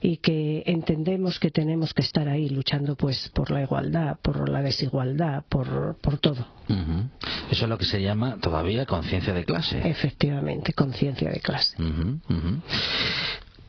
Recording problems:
garbled, watery; badly
squashed, flat; heavily
high frequencies cut off; noticeable; nothing above 5 kHz

